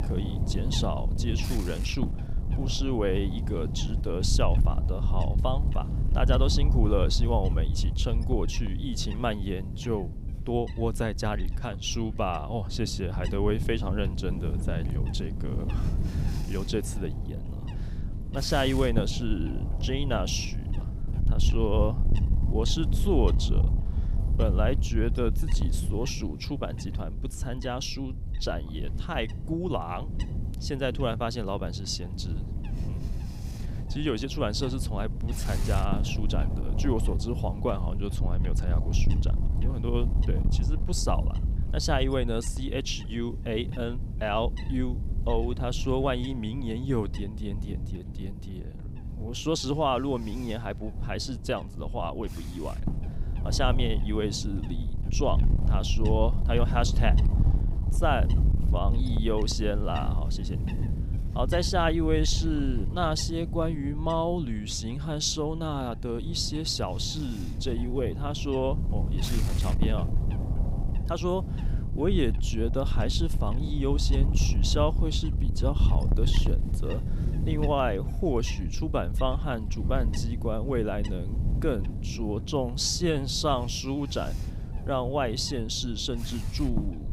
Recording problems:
wind noise on the microphone; occasional gusts; 10 dB below the speech

